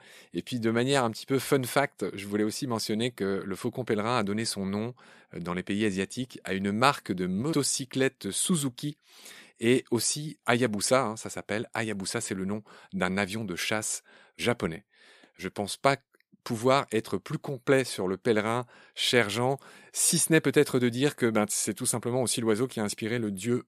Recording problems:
none

